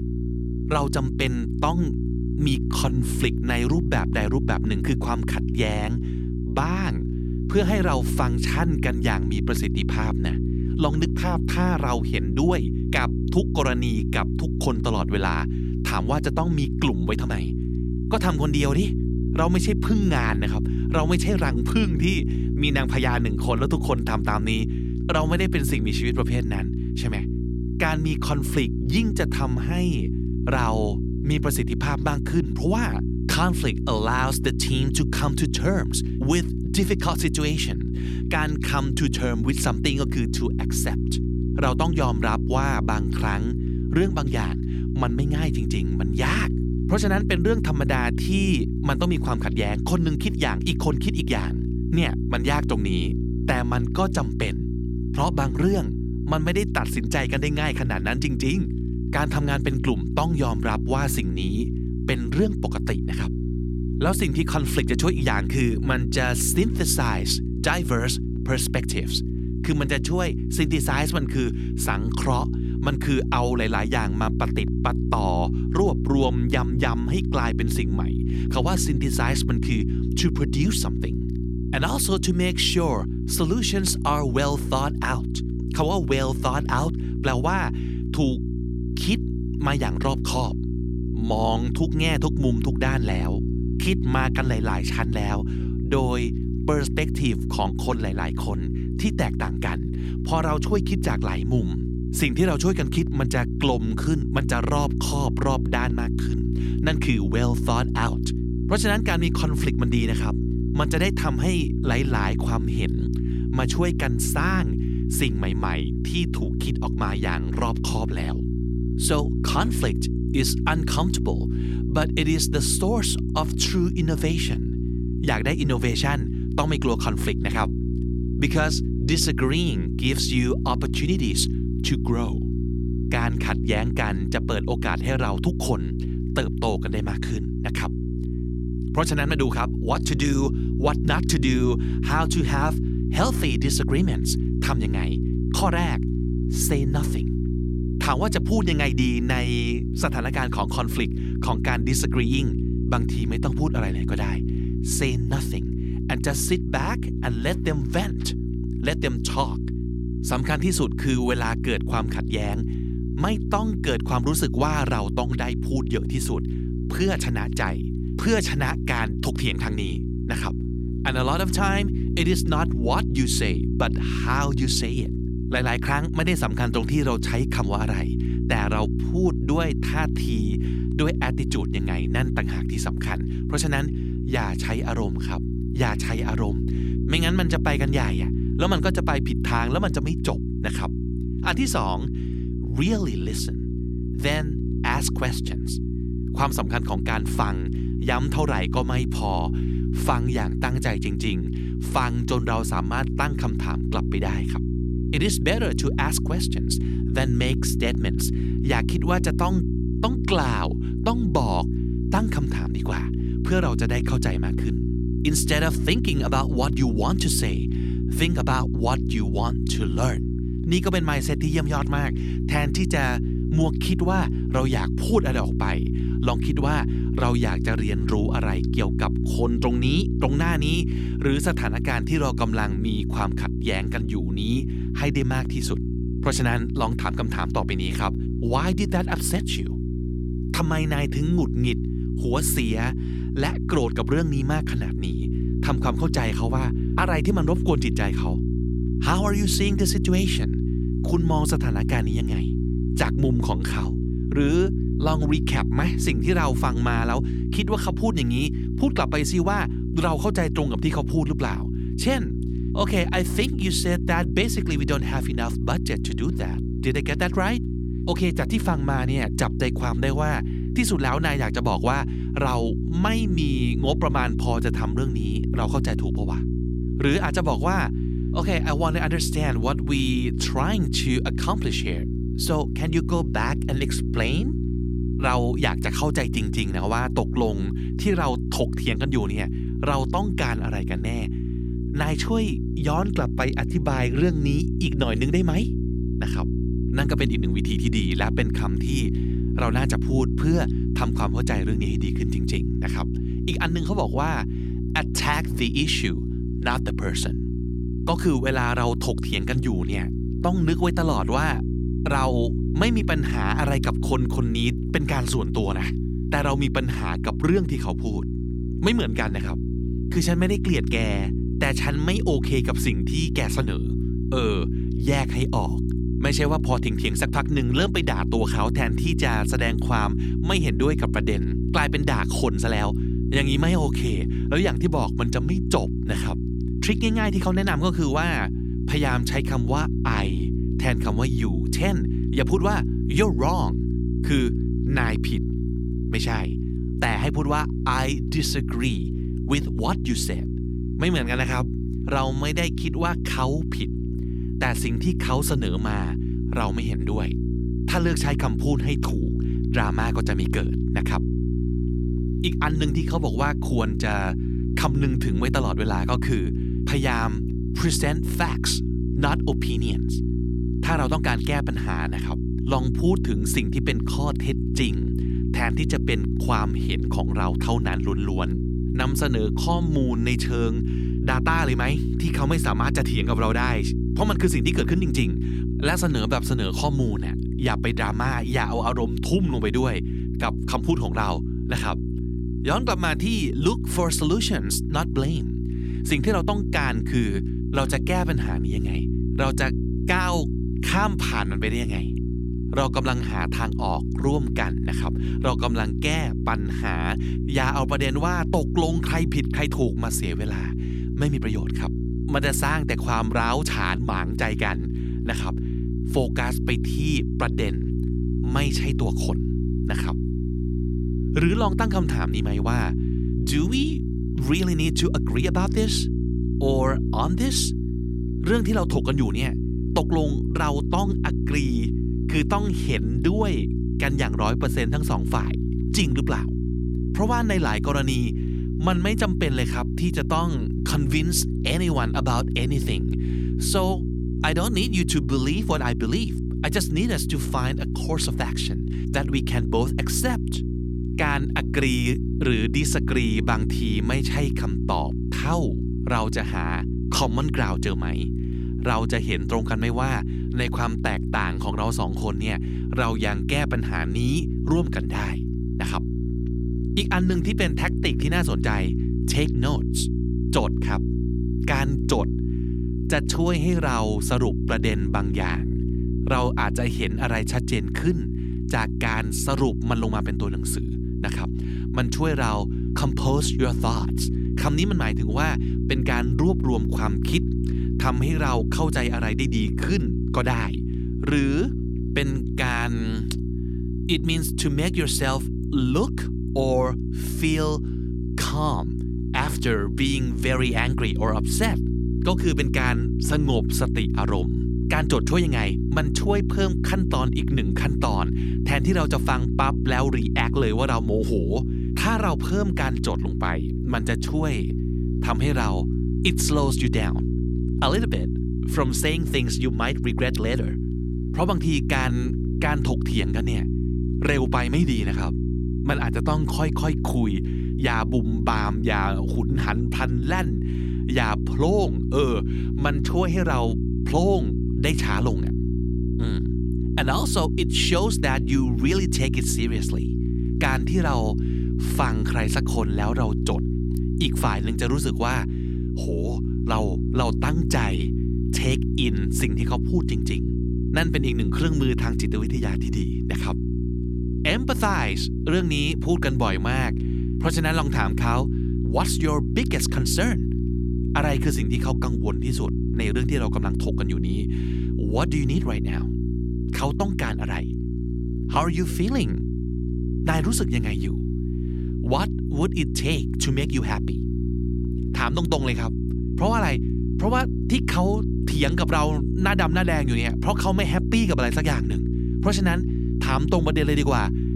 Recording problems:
electrical hum; loud; throughout; 60 Hz, 8 dB below the speech

